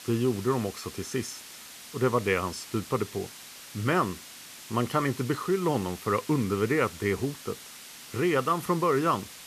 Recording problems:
hiss; noticeable; throughout; 15 dB below the speech

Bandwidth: 14.5 kHz